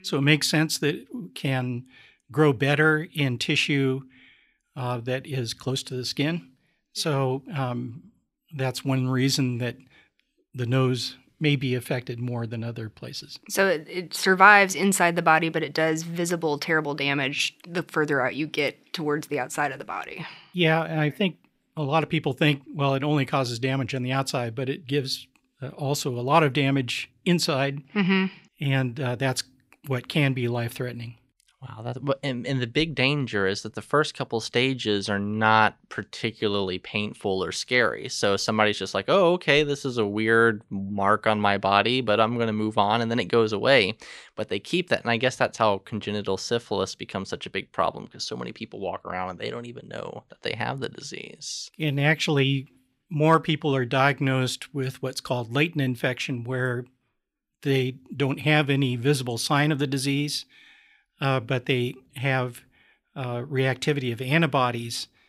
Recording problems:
none

